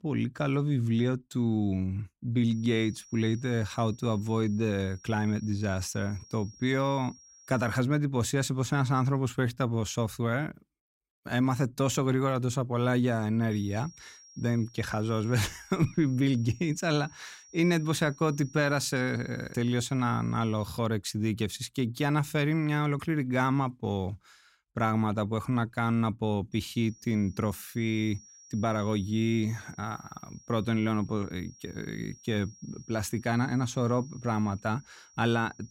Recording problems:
high-pitched whine; faint; from 2.5 to 8 s, from 14 to 21 s and from 27 s on; 5.5 kHz, 25 dB below the speech

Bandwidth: 16 kHz